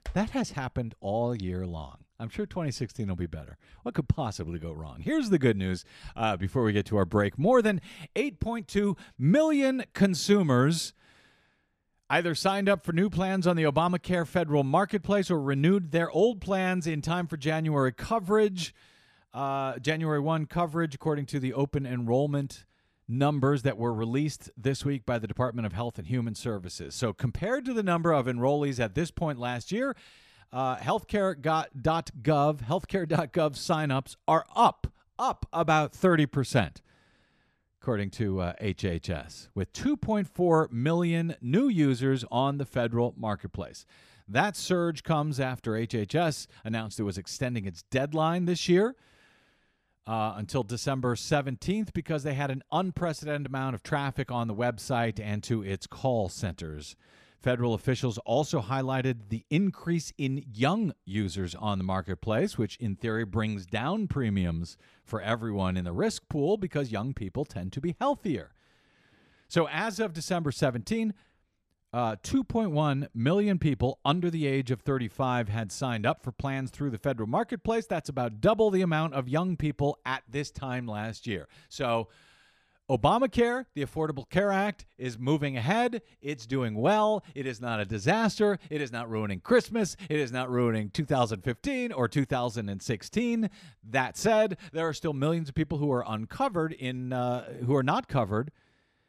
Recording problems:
none

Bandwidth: 14 kHz